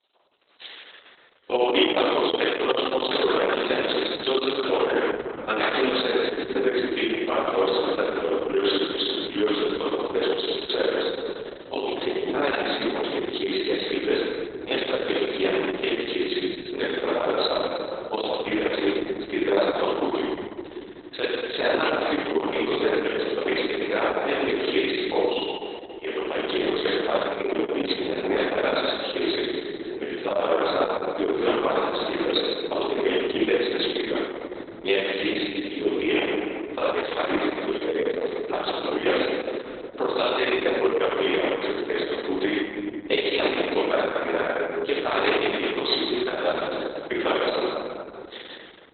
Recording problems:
off-mic speech; far
garbled, watery; badly; nothing above 4 kHz
room echo; noticeable; dies away in 3 s
thin; somewhat; fading below 300 Hz

